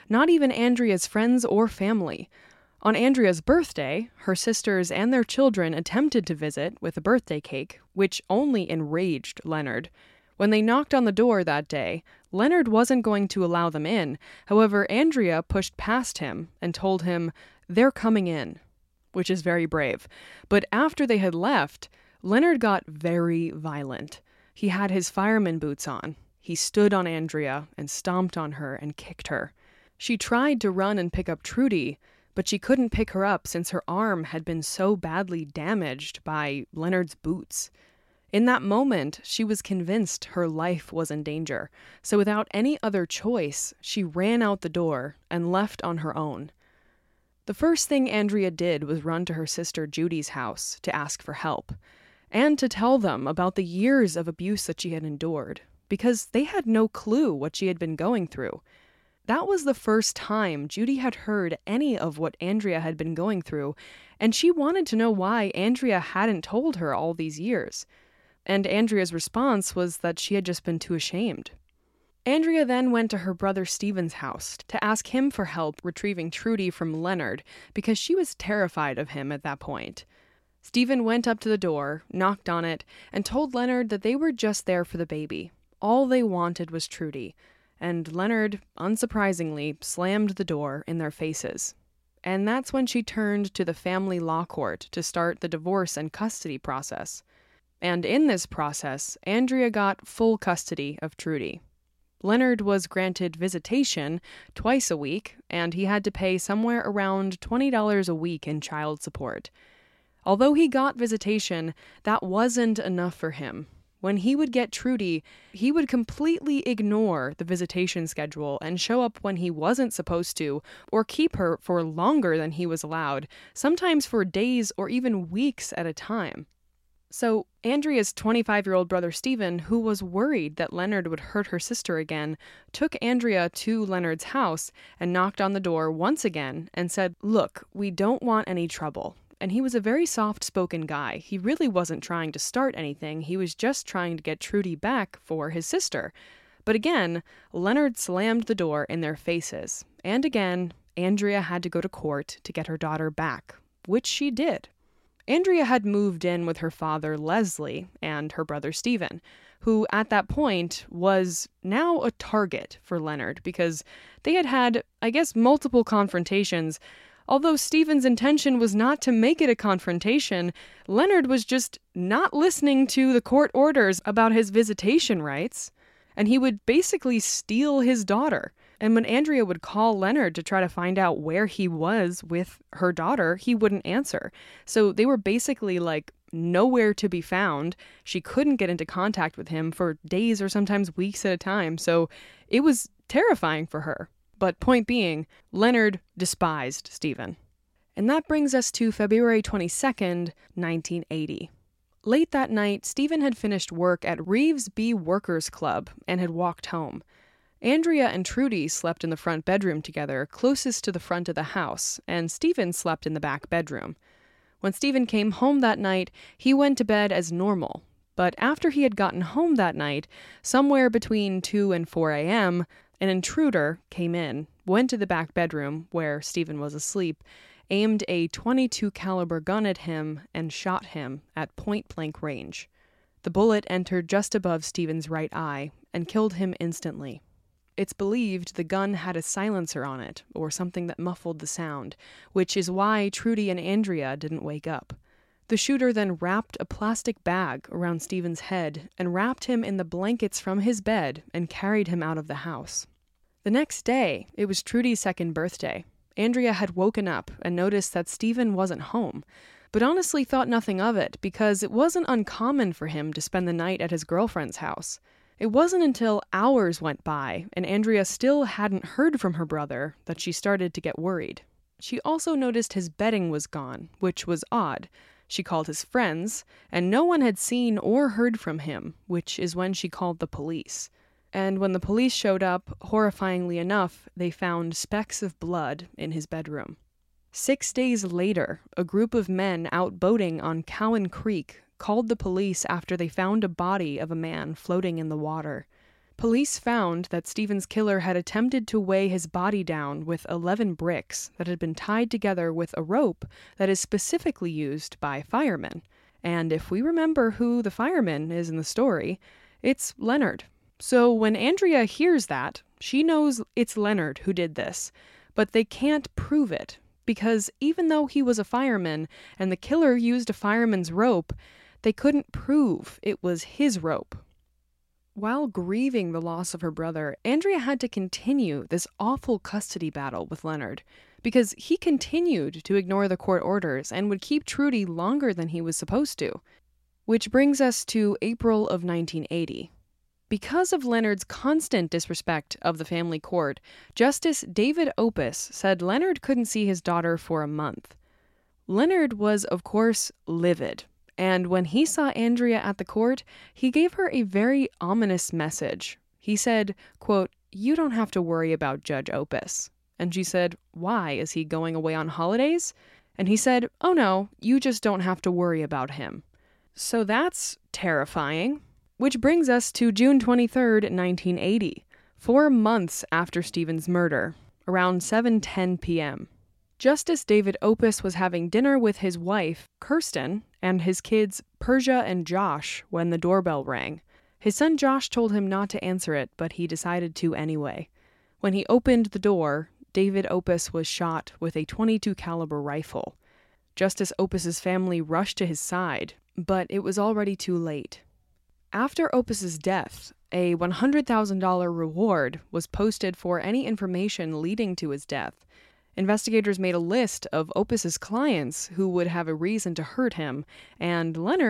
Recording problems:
abrupt cut into speech; at the end

